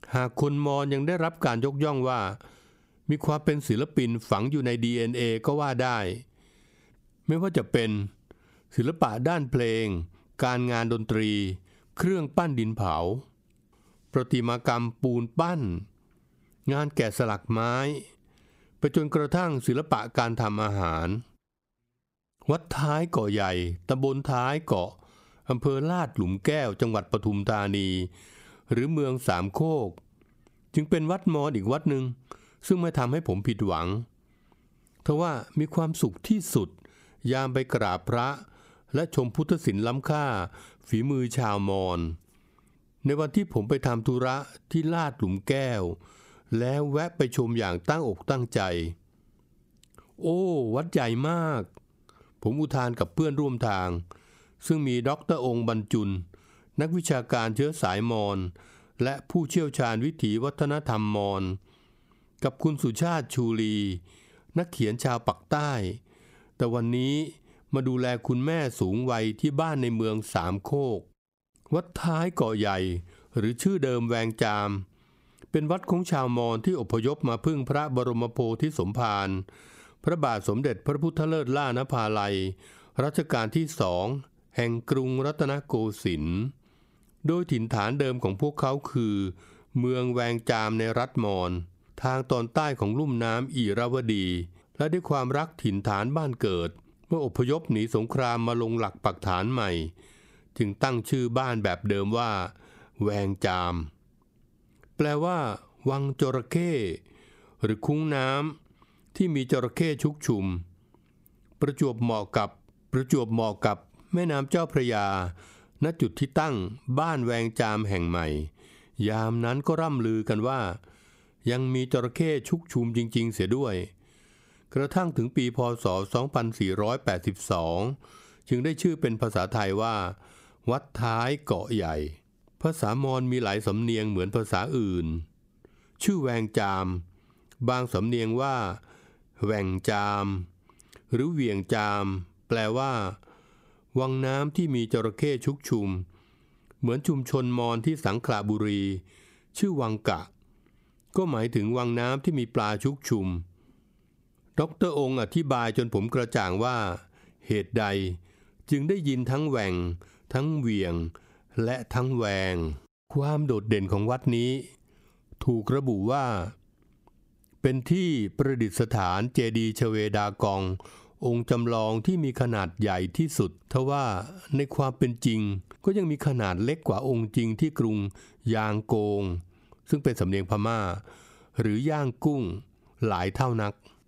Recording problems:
squashed, flat; somewhat

